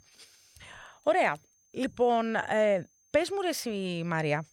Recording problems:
high-pitched whine; faint; throughout; 6.5 kHz, 35 dB below the speech

